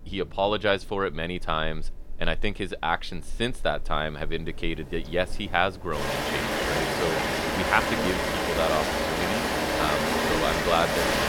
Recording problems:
rain or running water; very loud; throughout; 3 dB above the speech

